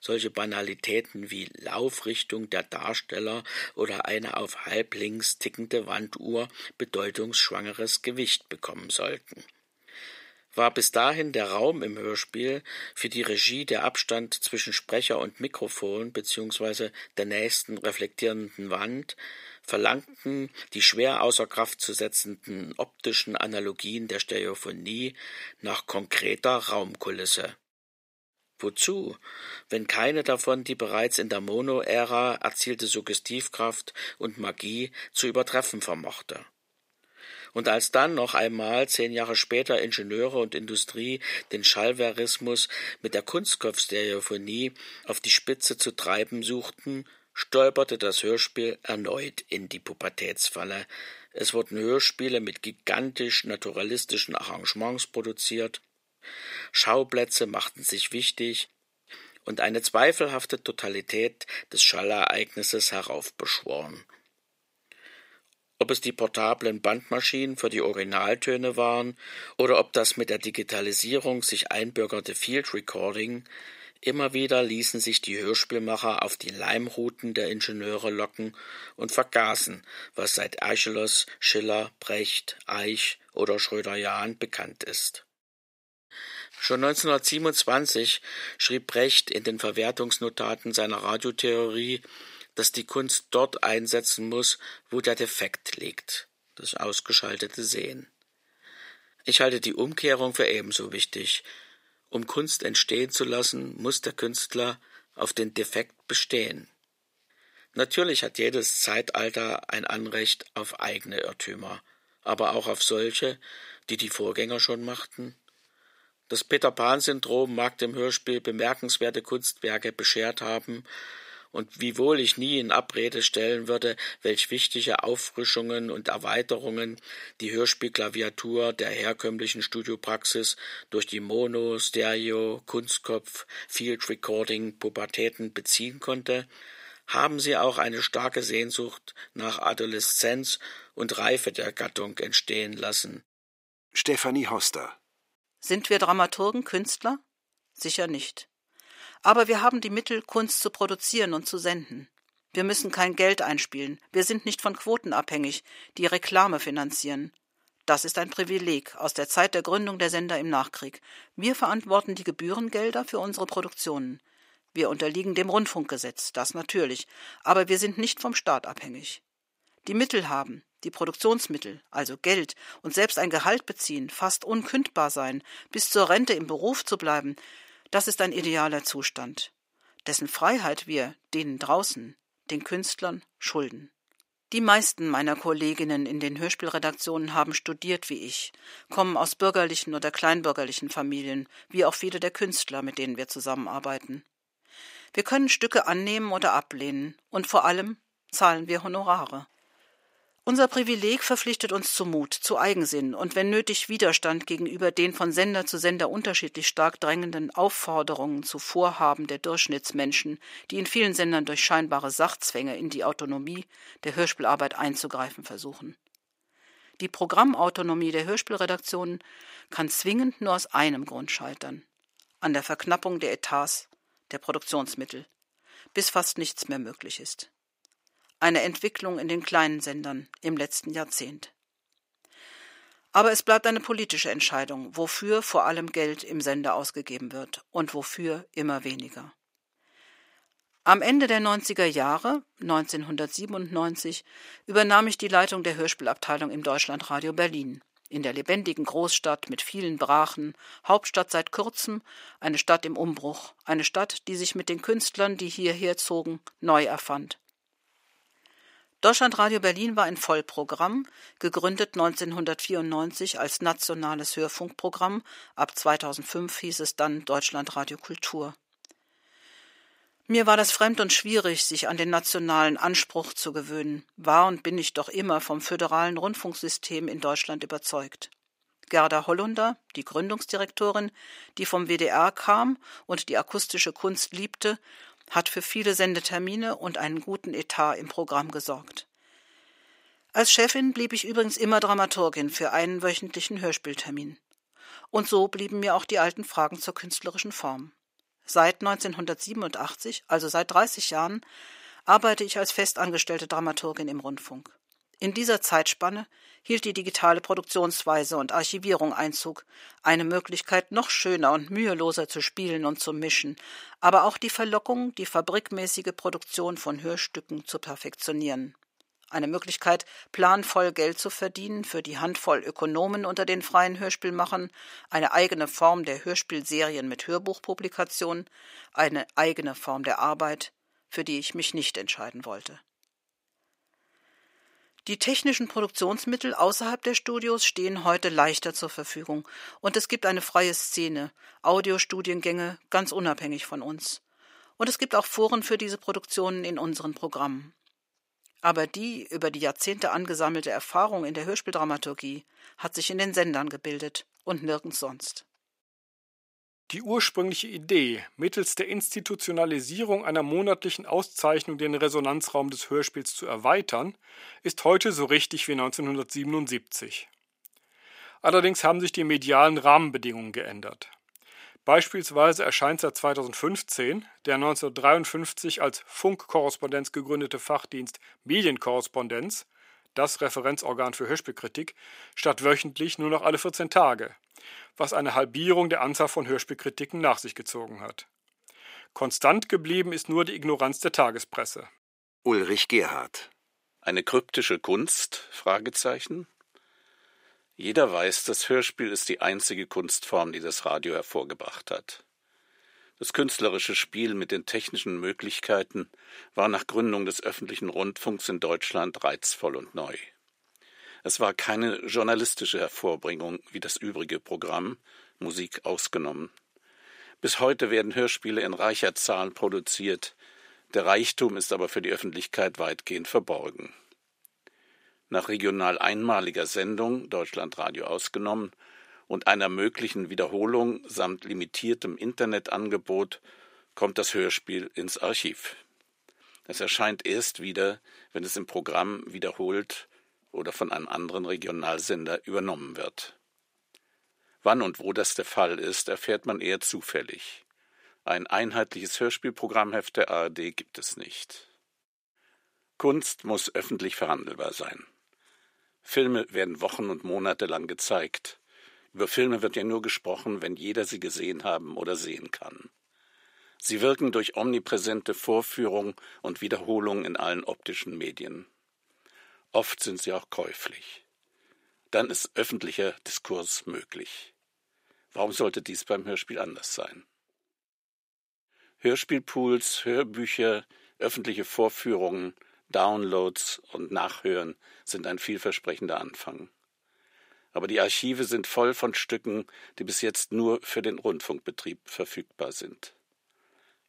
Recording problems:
thin; somewhat; fading below 450 Hz

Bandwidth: 15.5 kHz